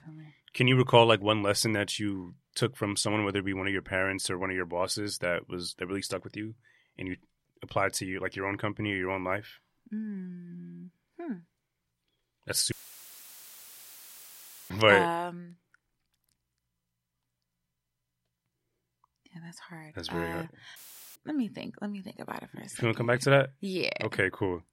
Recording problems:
audio cutting out; filled with static; at 13 s for 2 s and at 21 s

